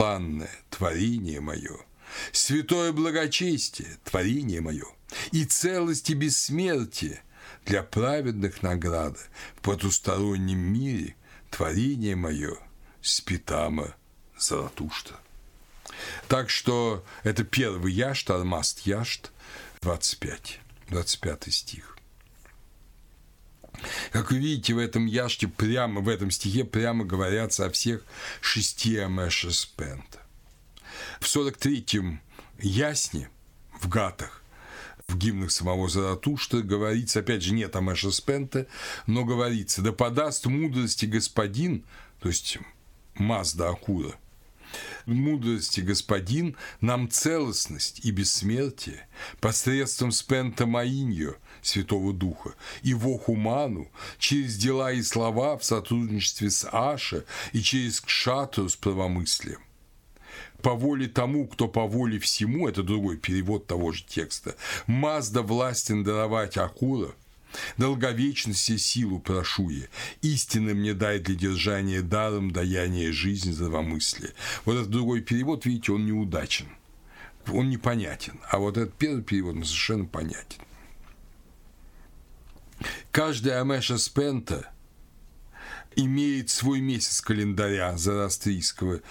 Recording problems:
squashed, flat; heavily
abrupt cut into speech; at the start
uneven, jittery; strongly; from 4 to 46 s

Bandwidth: 17.5 kHz